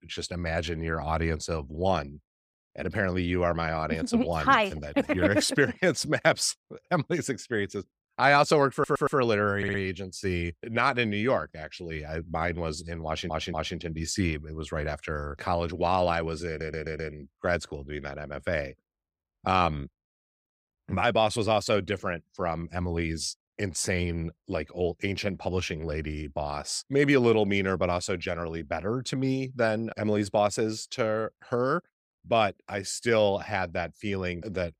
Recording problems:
audio stuttering; 4 times, first at 8.5 s

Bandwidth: 15.5 kHz